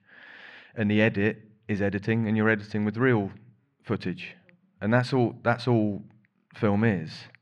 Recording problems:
muffled; slightly; fading above 2 kHz

